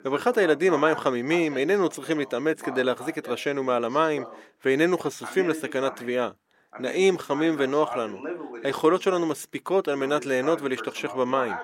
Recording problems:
thin; somewhat; fading below 350 Hz
voice in the background; noticeable; throughout; 15 dB below the speech

